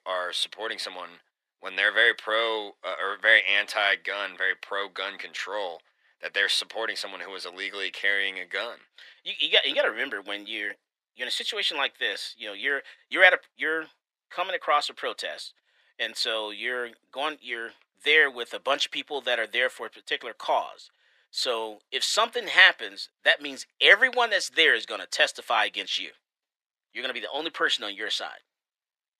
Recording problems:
thin; very; fading below 500 Hz

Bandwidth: 14.5 kHz